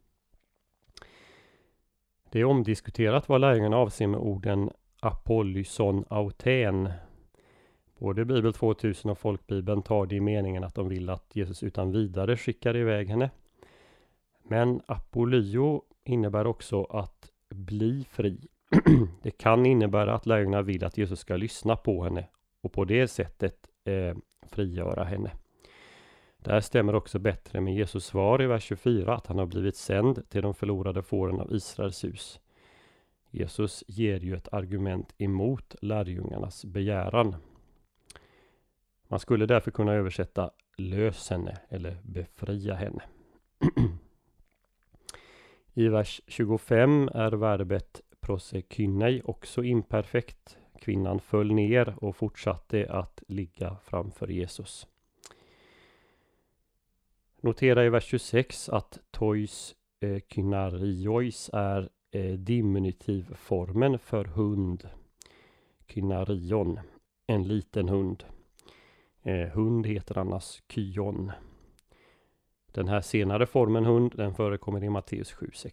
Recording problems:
none

